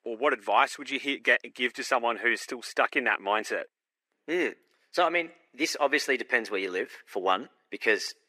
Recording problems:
thin; very; fading below 350 Hz

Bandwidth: 15 kHz